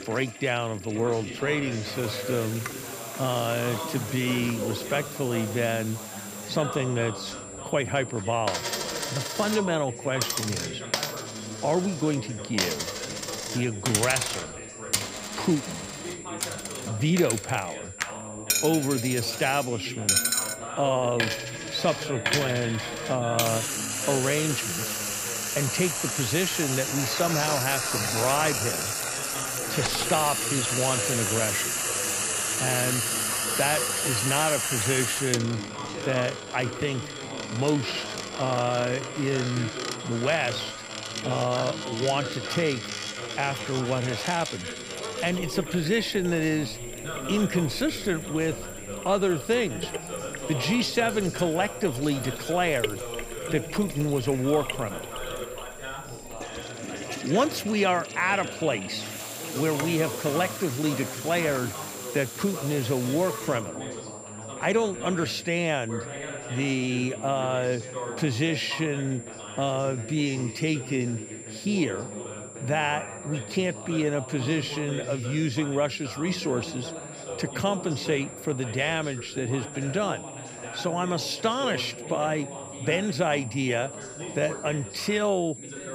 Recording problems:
household noises; loud; until 1:05; 2 dB below the speech
high-pitched whine; noticeable; throughout; 7.5 kHz, 15 dB below the speech
background chatter; noticeable; throughout; 2 voices, 10 dB below the speech

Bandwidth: 15 kHz